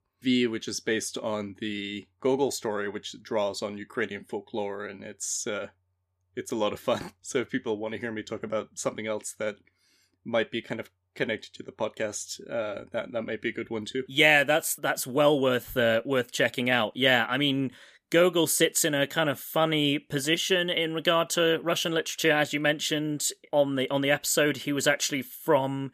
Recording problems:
none

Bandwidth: 14.5 kHz